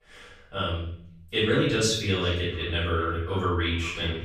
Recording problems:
off-mic speech; far
echo of what is said; noticeable; from 2 s on; 390 ms later, 20 dB below the speech
room echo; noticeable; dies away in 0.6 s

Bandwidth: 15.5 kHz